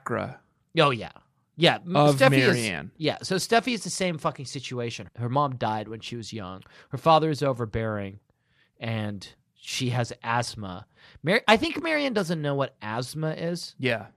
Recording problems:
none

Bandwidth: 14.5 kHz